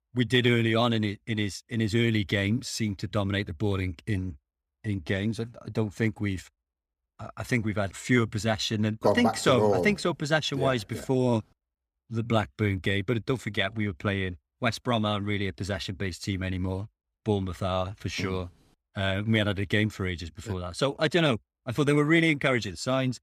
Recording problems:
none

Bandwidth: 15 kHz